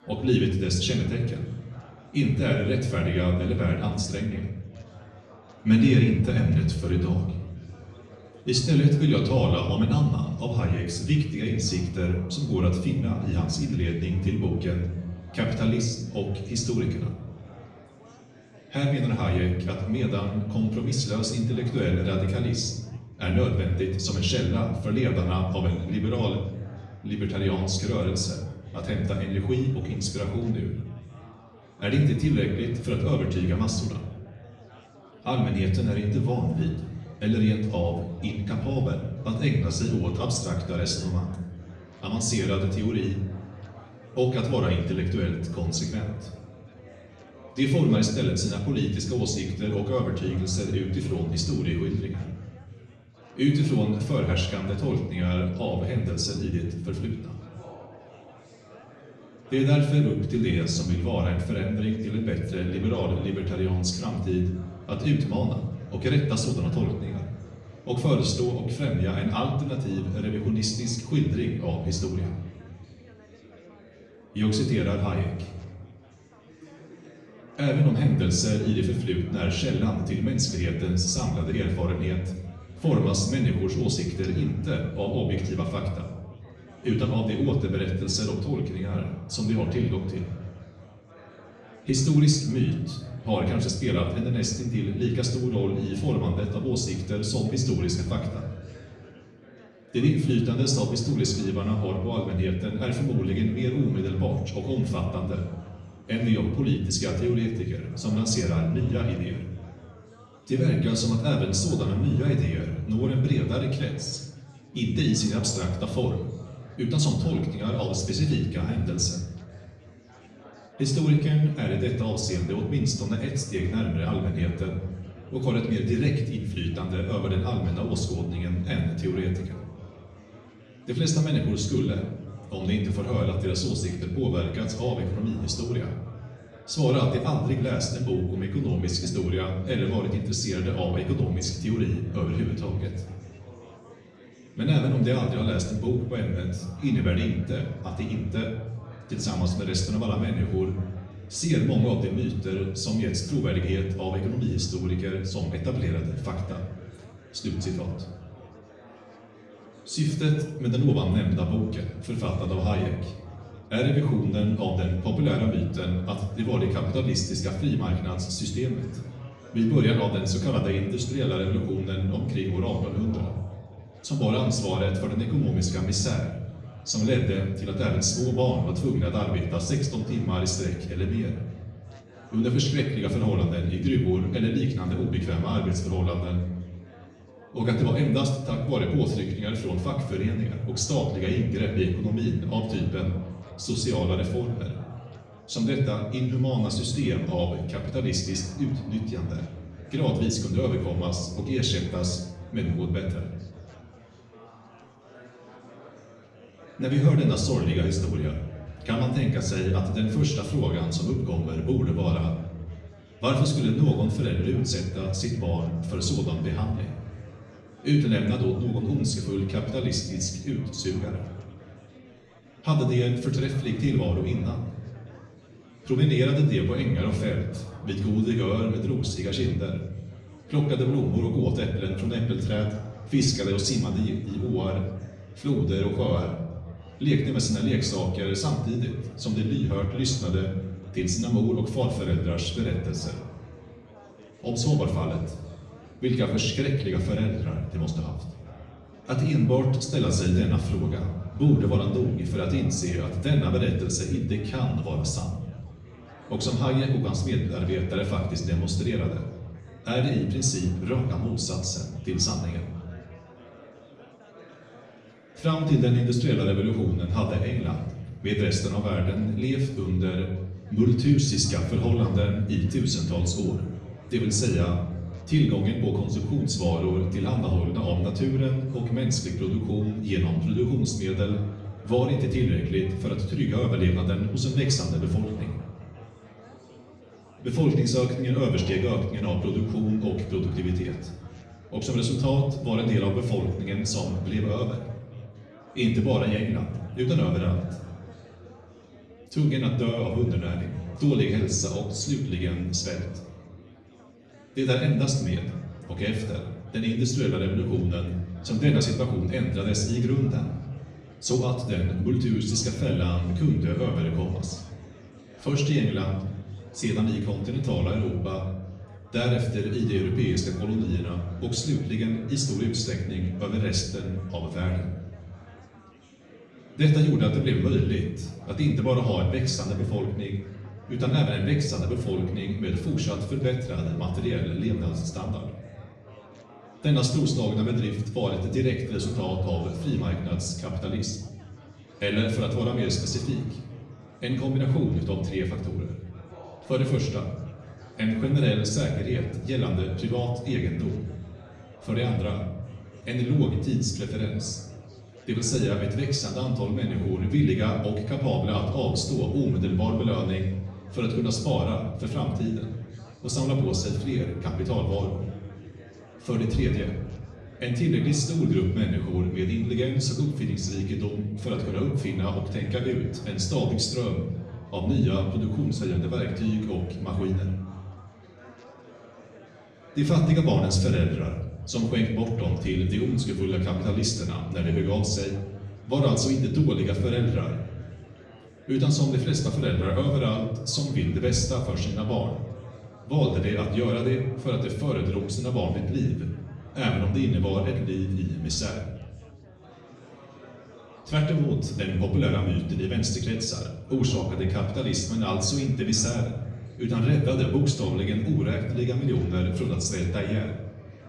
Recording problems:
off-mic speech; far
room echo; noticeable; dies away in 0.8 s
chatter from many people; faint; throughout; 25 dB below the speech

